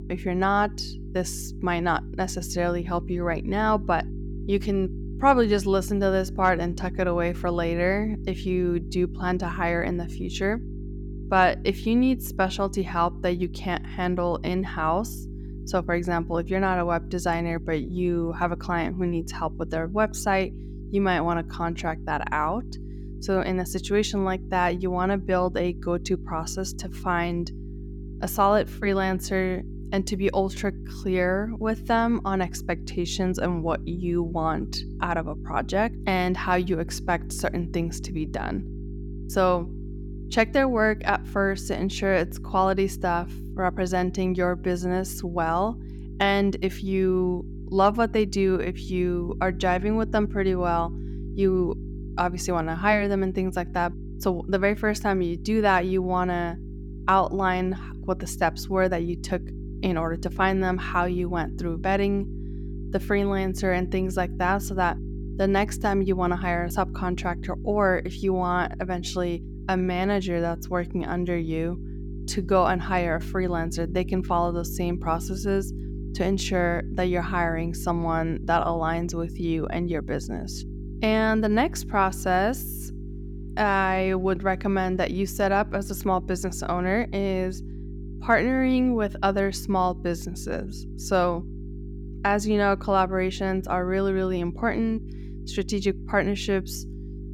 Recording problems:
electrical hum; noticeable; throughout; 50 Hz, 20 dB below the speech

